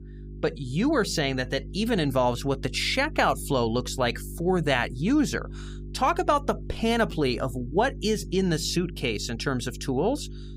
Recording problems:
electrical hum; faint; throughout; 50 Hz, 25 dB below the speech

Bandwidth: 15.5 kHz